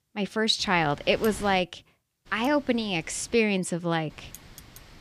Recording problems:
wind noise on the microphone; occasional gusts; from 0.5 to 1.5 s, from 2.5 to 3.5 s and at 4 s; 20 dB below the speech

